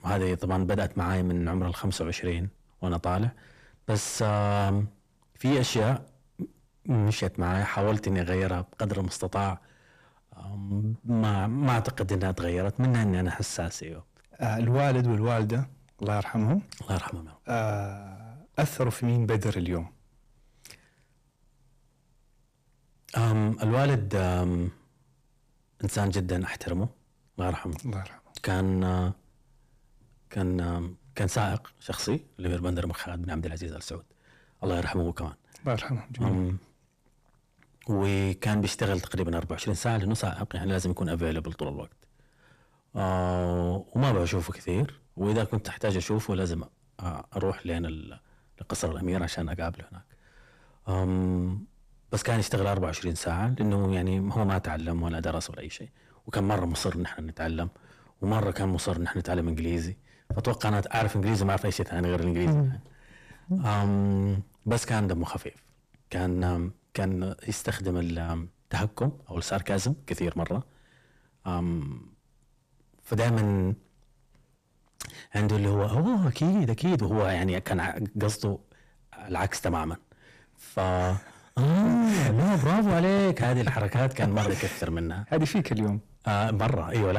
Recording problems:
distortion; heavy; 6 dB below the speech
abrupt cut into speech; at the end

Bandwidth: 14.5 kHz